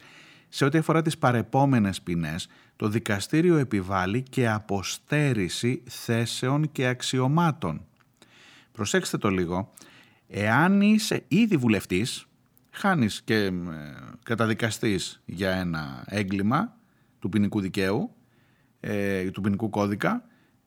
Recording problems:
uneven, jittery; strongly; from 4.5 to 19 s

